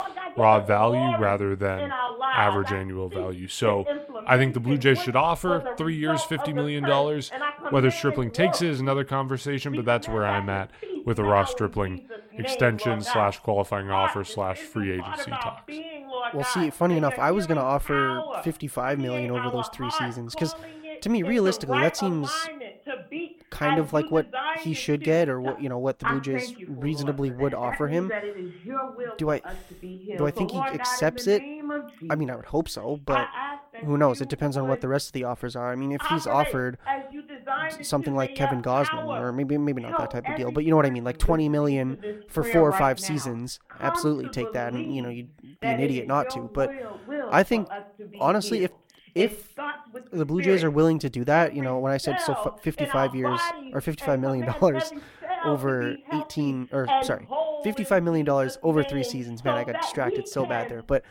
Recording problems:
voice in the background; loud; throughout; 6 dB below the speech

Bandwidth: 16.5 kHz